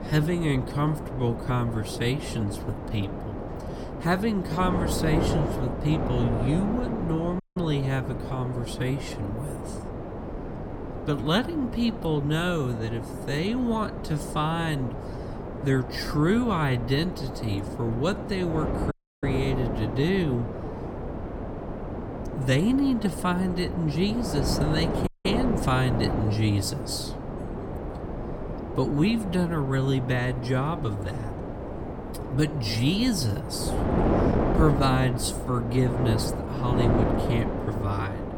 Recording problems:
wrong speed, natural pitch; too slow; 0.6 times normal speed
wind noise on the microphone; heavy; 4 dB below the speech
audio cutting out; at 7.5 s, at 19 s and at 25 s

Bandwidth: 17.5 kHz